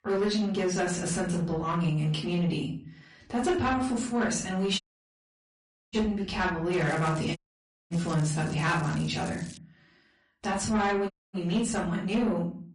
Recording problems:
off-mic speech; far
room echo; slight; dies away in 0.4 s
distortion; slight; 10 dB below the speech
garbled, watery; slightly; nothing above 10.5 kHz
crackling; noticeable; from 6.5 to 9.5 s; 20 dB below the speech
audio cutting out; at 5 s for 1 s, at 7.5 s for 0.5 s and at 11 s

